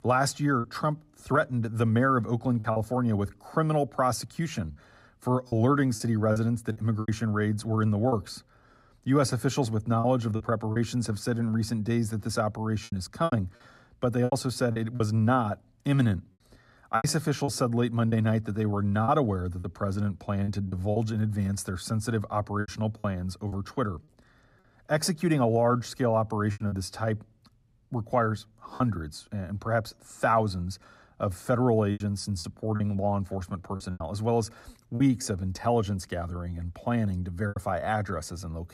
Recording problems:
choppy; very; 6% of the speech affected

